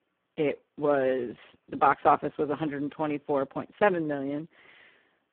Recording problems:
phone-call audio; poor line

